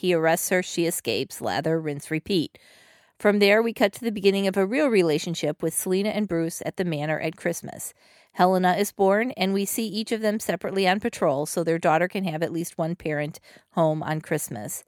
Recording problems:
none

